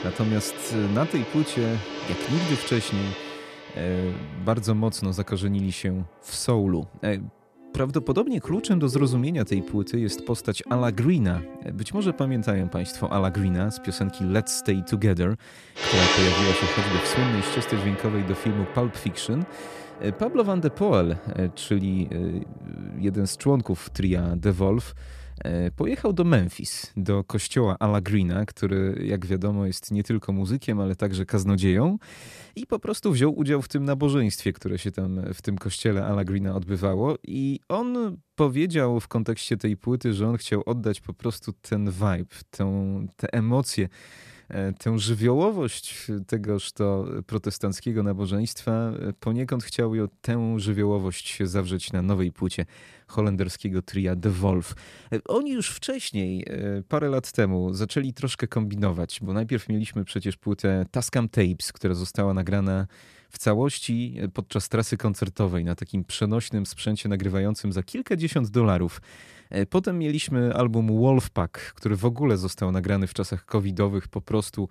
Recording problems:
background music; loud; until 26 s; 5 dB below the speech

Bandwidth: 14 kHz